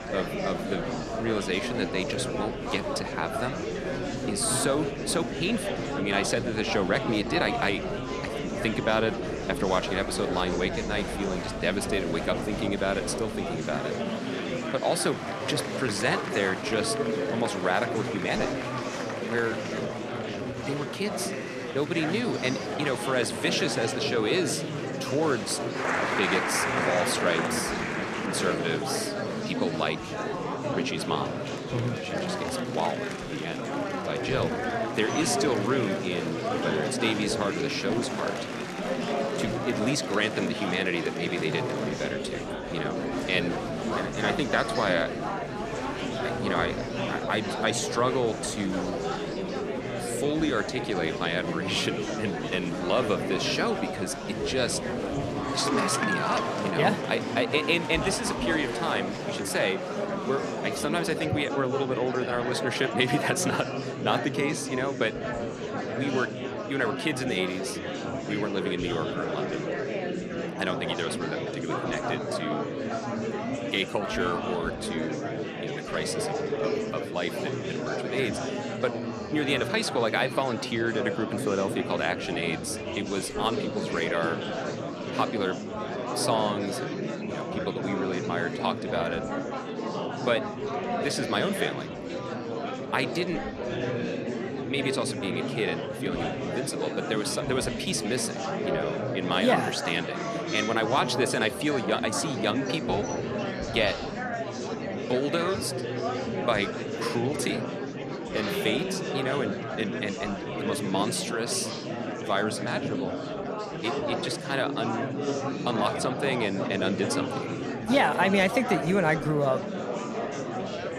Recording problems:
murmuring crowd; loud; throughout; 2 dB below the speech

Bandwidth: 14.5 kHz